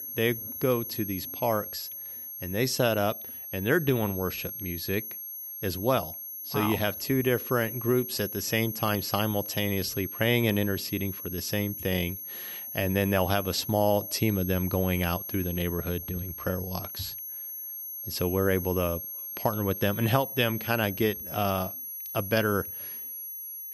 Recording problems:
high-pitched whine; loud; throughout; 11.5 kHz, 7 dB below the speech

